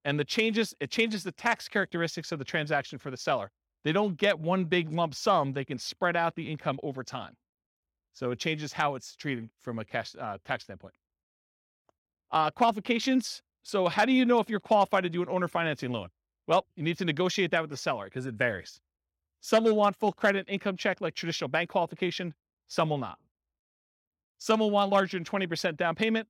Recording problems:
none

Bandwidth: 16.5 kHz